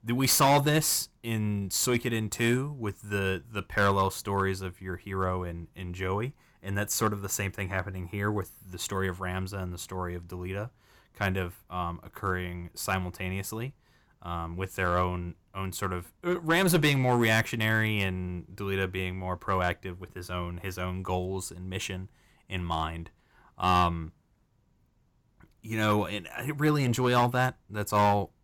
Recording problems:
distortion; slight; 2% of the sound clipped

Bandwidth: 18.5 kHz